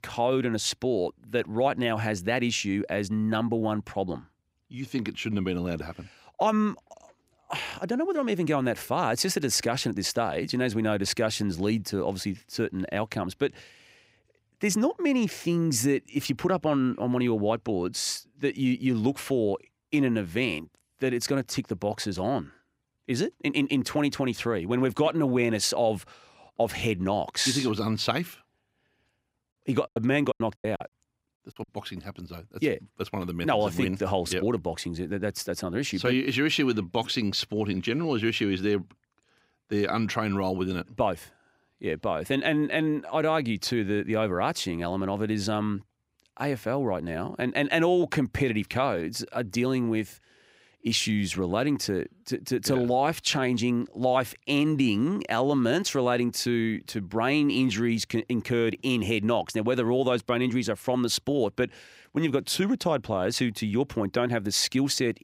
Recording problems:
choppy; very; from 30 to 32 s; 23% of the speech affected

